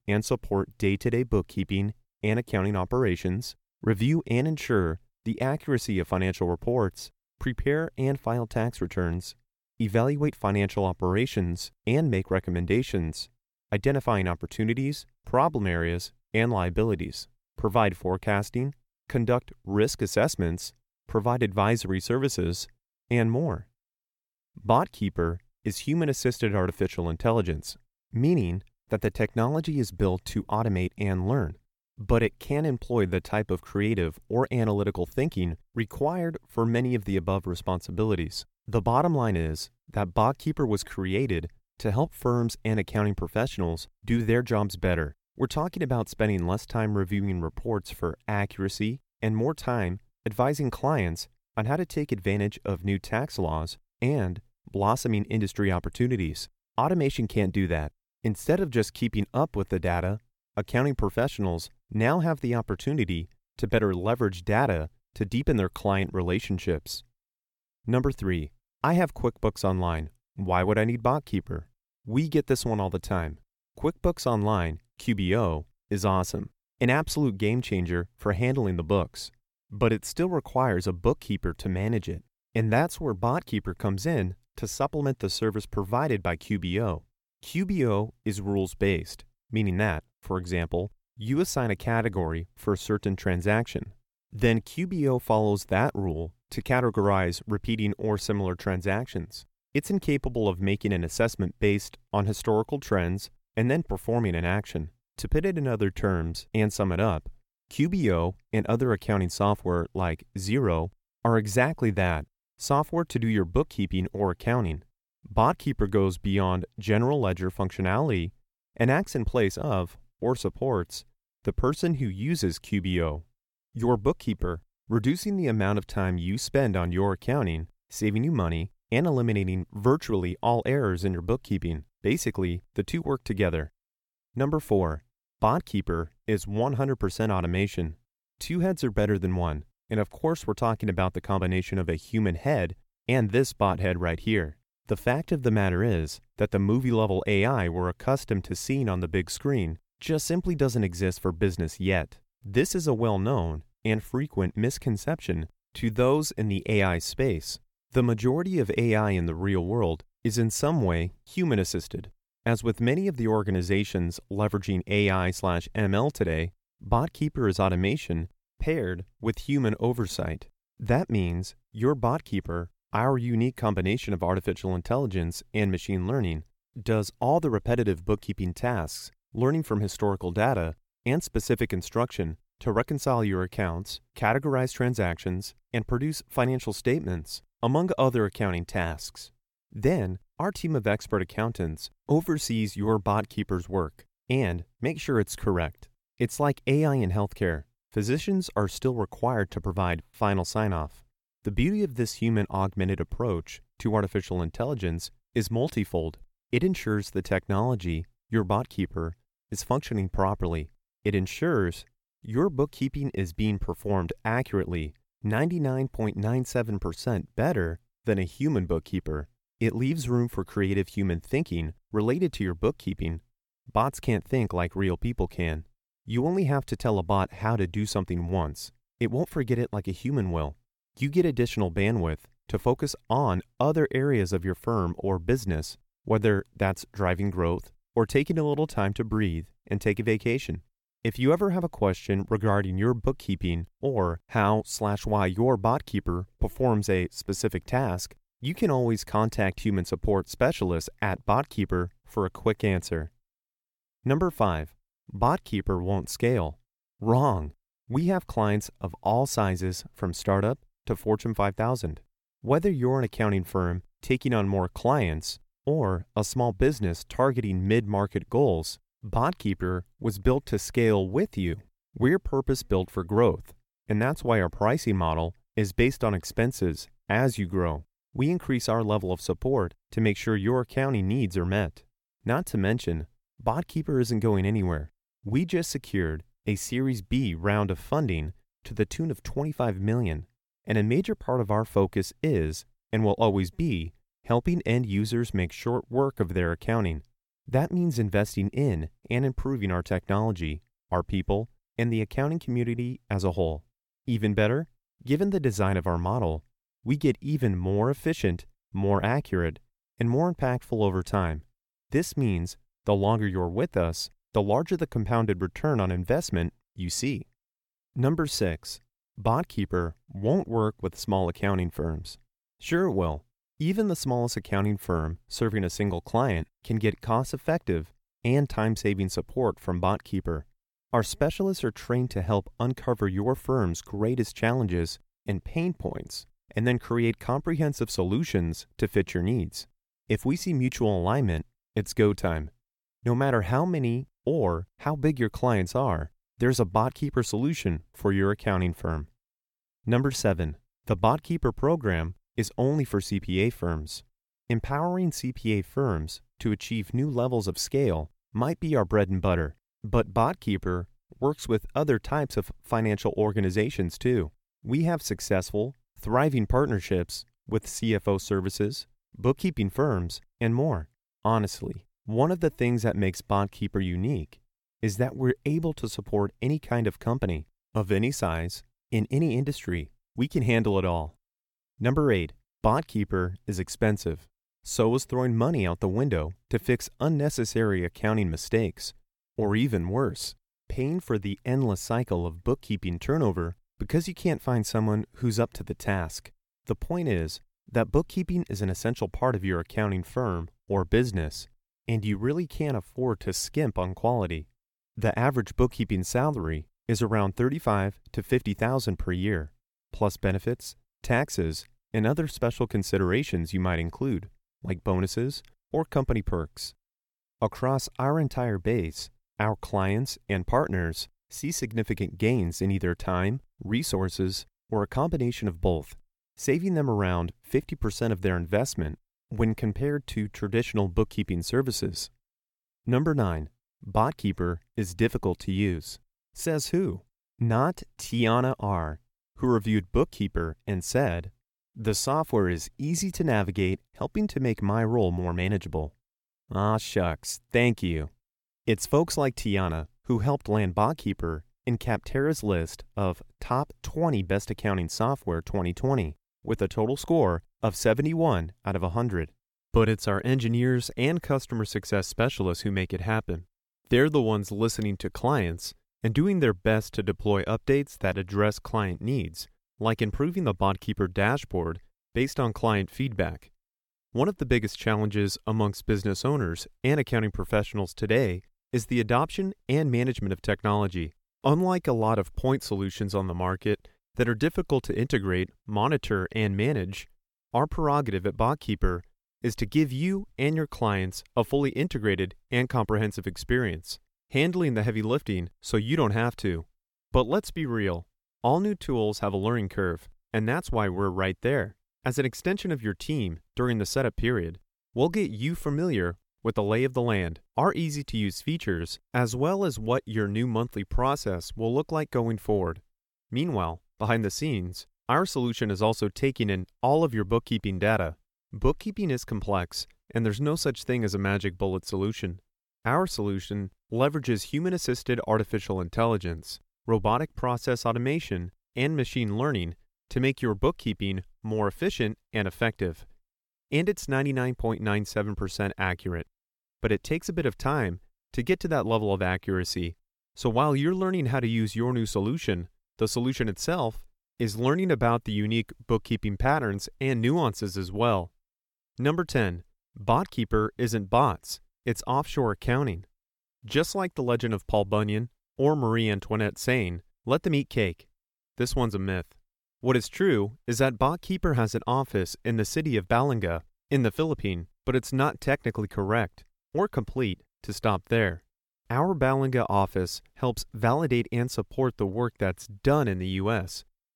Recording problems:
none

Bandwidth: 17 kHz